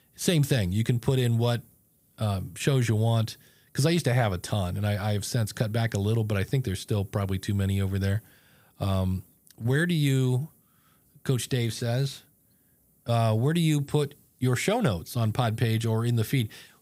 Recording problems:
none

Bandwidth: 15.5 kHz